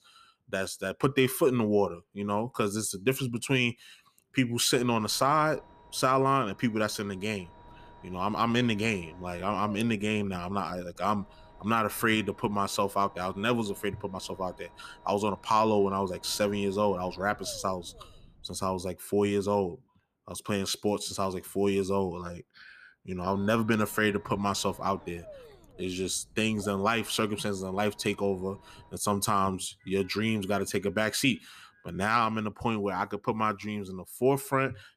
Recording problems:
low rumble; faint; from 5 to 19 s and from 23 to 29 s; 25 dB below the speech

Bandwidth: 14.5 kHz